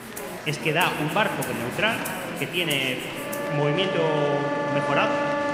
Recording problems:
room echo; slight; dies away in 2.7 s
background music; loud; throughout; 4 dB below the speech
murmuring crowd; loud; throughout; 10 dB below the speech

